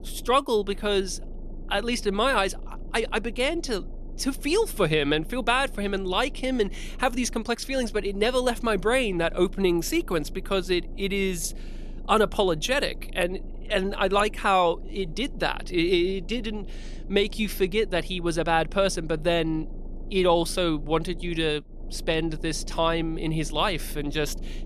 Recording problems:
low rumble; faint; throughout; 25 dB below the speech

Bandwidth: 13.5 kHz